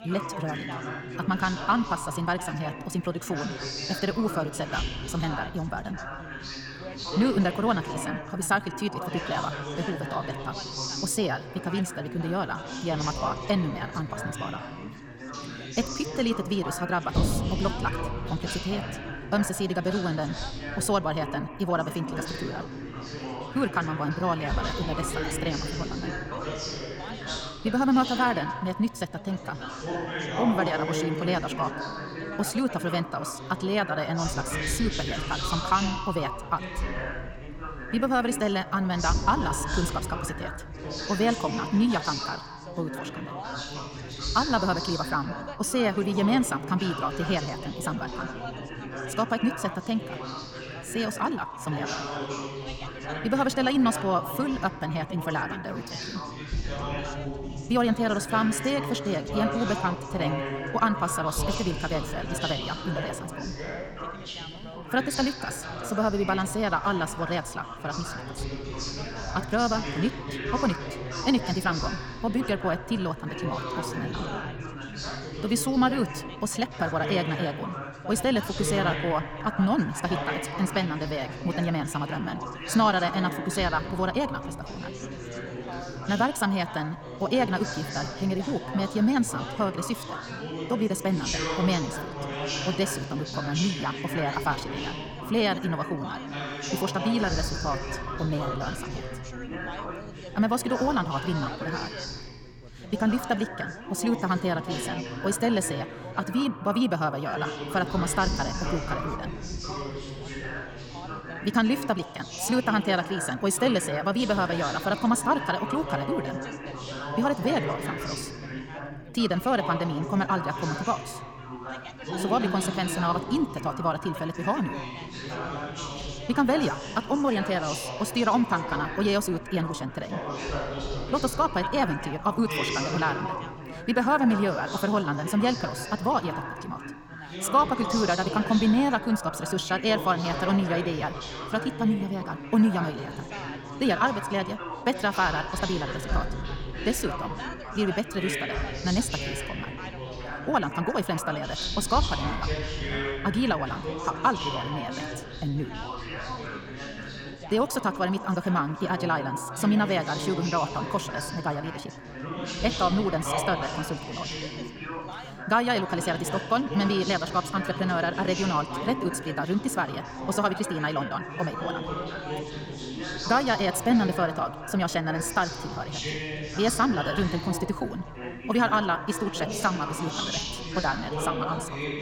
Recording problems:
wrong speed, natural pitch; too fast; 1.6 times normal speed
echo of what is said; noticeable; throughout; 90 ms later, 15 dB below the speech
background chatter; loud; throughout; 4 voices, 6 dB below the speech

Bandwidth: 18 kHz